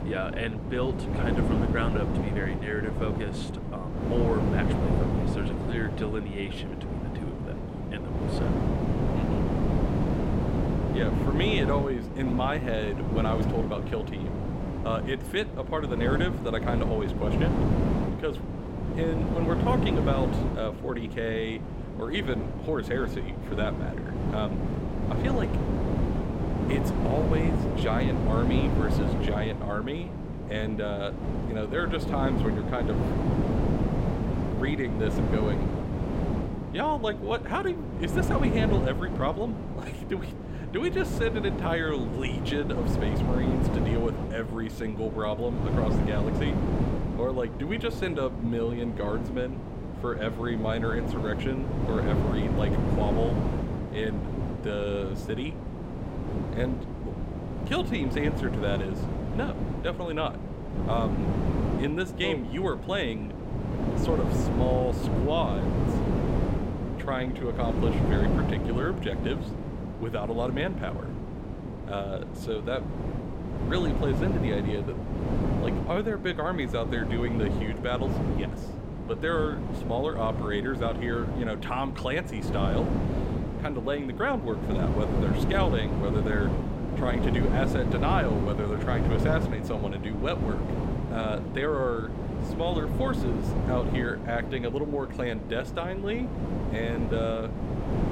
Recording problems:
wind noise on the microphone; heavy; 3 dB below the speech

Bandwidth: 16 kHz